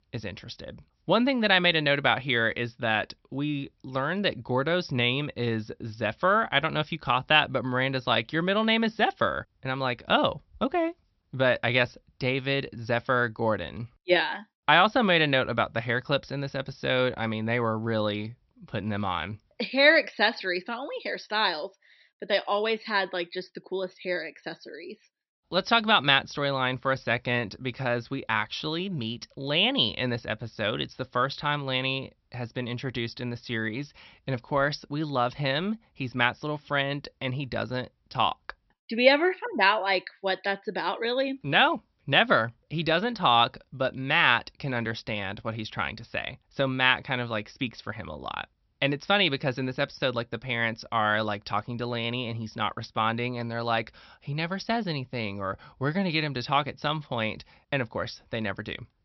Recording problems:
high frequencies cut off; noticeable; nothing above 5.5 kHz

